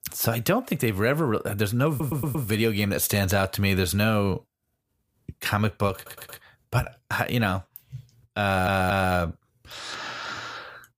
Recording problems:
audio stuttering; at 2 s, at 6 s and at 8.5 s

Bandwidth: 15 kHz